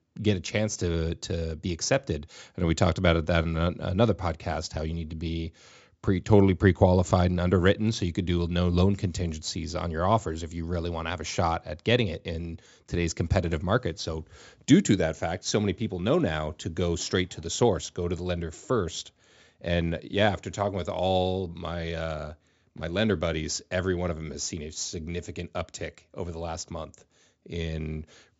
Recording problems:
high frequencies cut off; noticeable; nothing above 8 kHz

